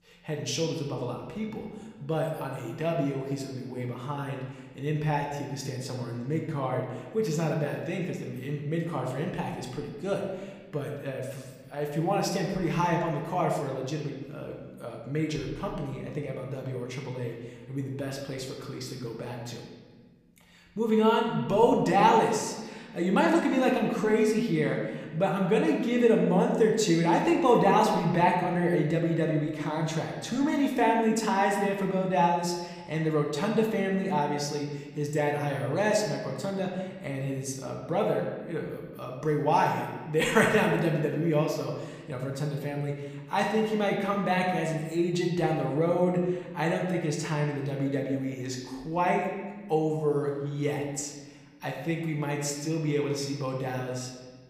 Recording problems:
room echo; noticeable; dies away in 1.2 s
off-mic speech; somewhat distant

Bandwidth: 15 kHz